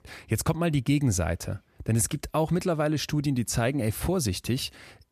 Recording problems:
none

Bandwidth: 14.5 kHz